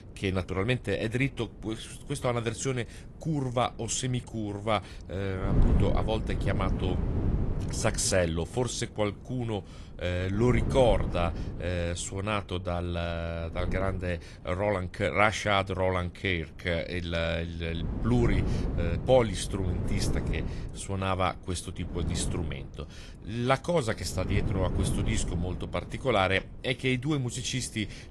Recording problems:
garbled, watery; slightly
wind noise on the microphone; occasional gusts; 10 dB below the speech

